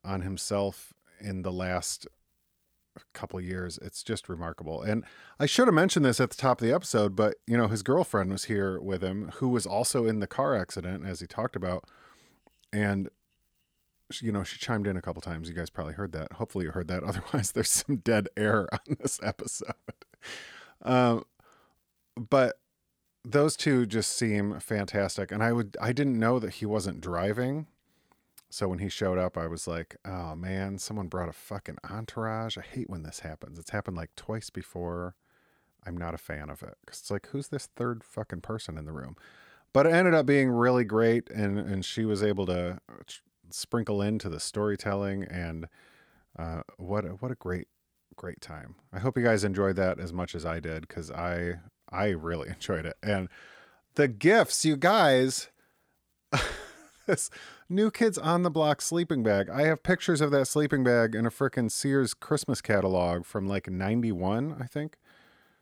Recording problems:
none

